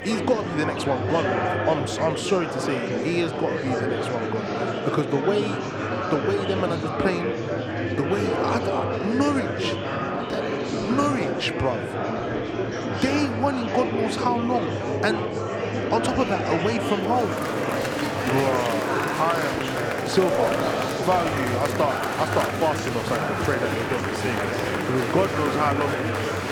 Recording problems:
murmuring crowd; very loud; throughout; as loud as the speech

